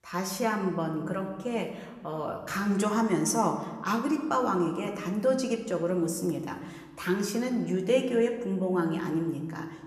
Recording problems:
room echo; slight; dies away in 1 s
off-mic speech; somewhat distant

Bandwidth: 14 kHz